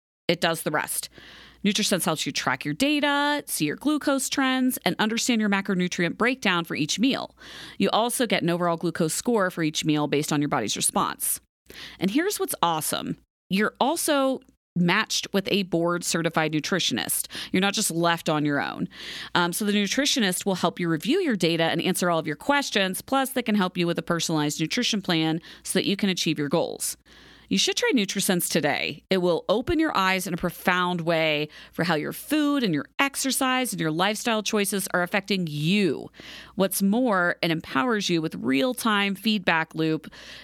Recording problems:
none

